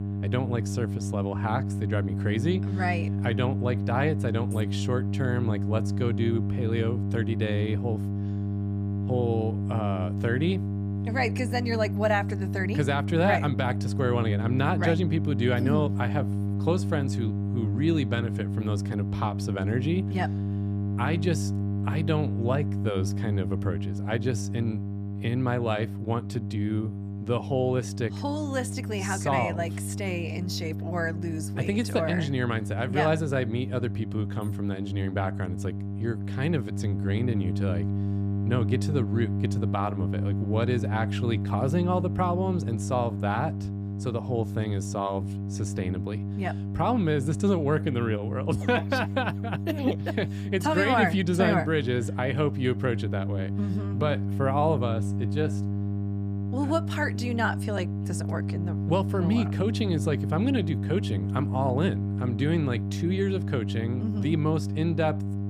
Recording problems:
electrical hum; loud; throughout; 50 Hz, 9 dB below the speech

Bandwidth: 14.5 kHz